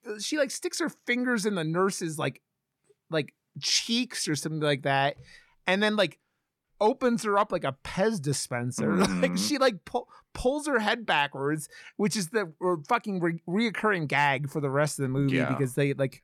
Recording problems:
none

